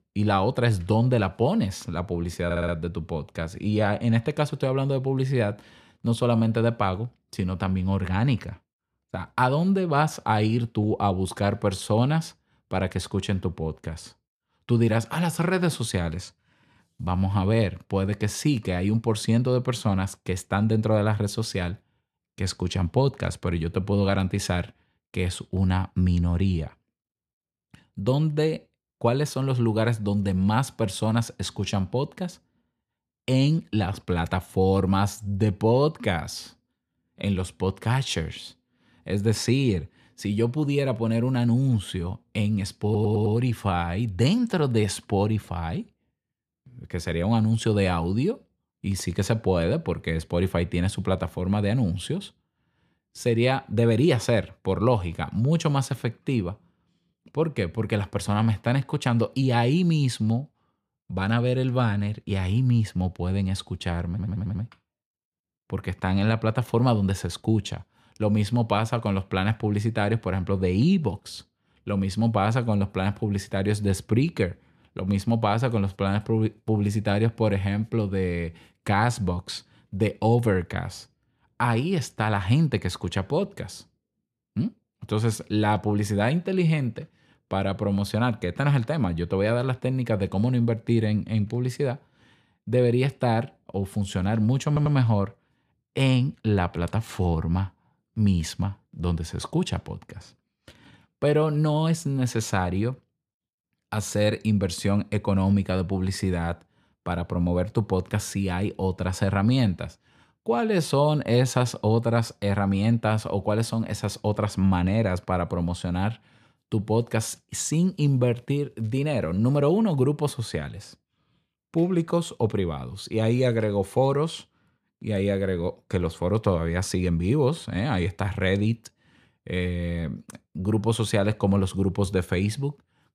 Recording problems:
audio stuttering; 4 times, first at 2.5 s

